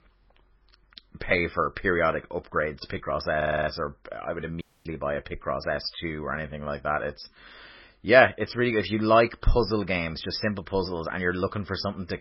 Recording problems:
garbled, watery; badly; nothing above 5.5 kHz
audio stuttering; at 3.5 s
audio cutting out; at 4.5 s

